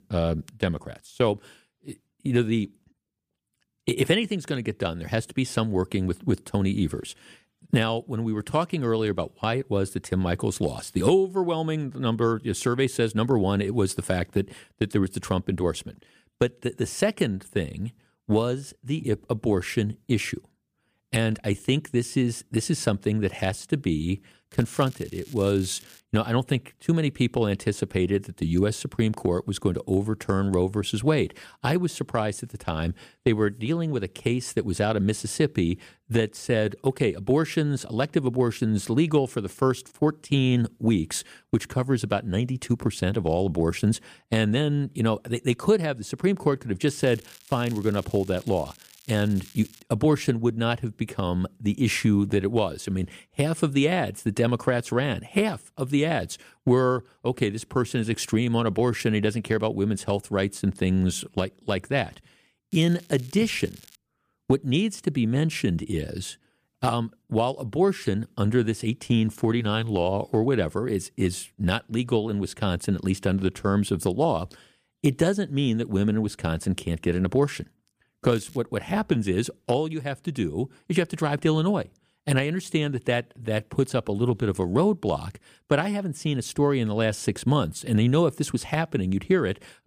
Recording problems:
crackling; faint; 4 times, first at 25 s; 25 dB below the speech

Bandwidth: 15 kHz